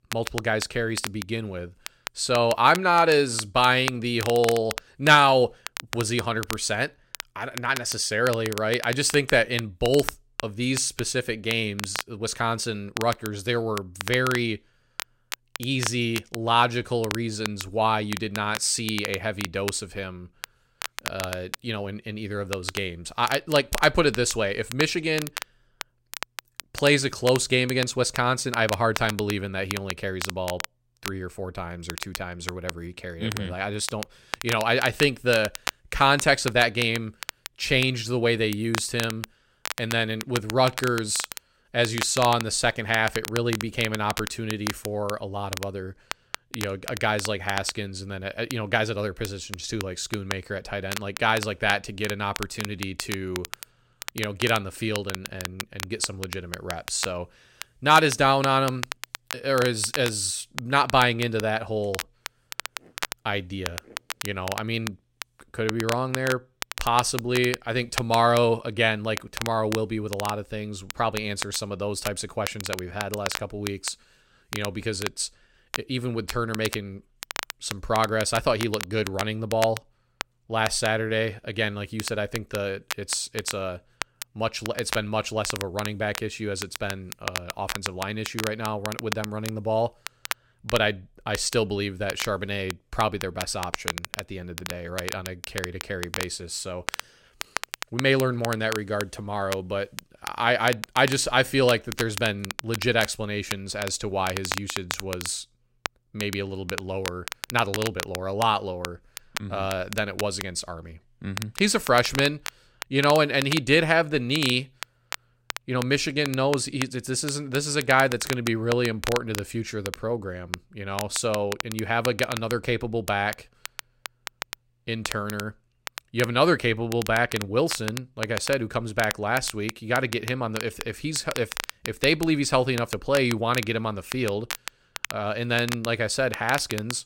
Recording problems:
crackle, like an old record; loud; 10 dB below the speech

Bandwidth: 16 kHz